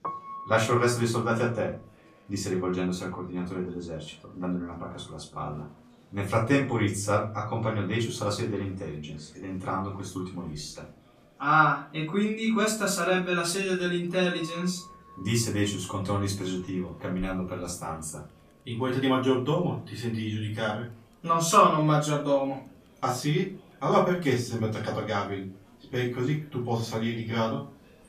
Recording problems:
off-mic speech; far
room echo; slight; dies away in 0.3 s
background music; faint; throughout; 20 dB below the speech
murmuring crowd; faint; throughout; 30 dB below the speech

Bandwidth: 14.5 kHz